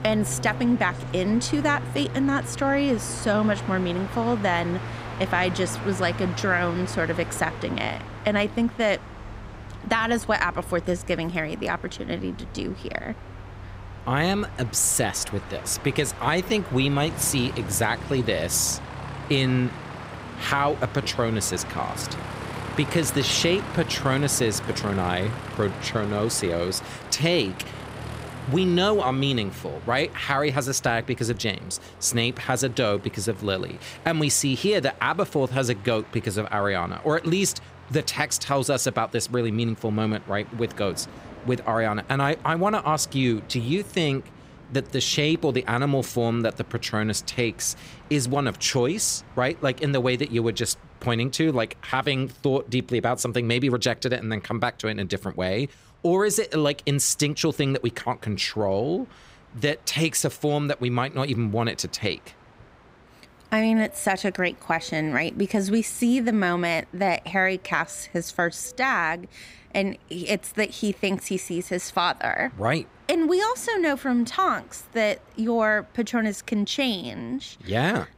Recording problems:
train or aircraft noise; noticeable; throughout; 15 dB below the speech

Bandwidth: 15.5 kHz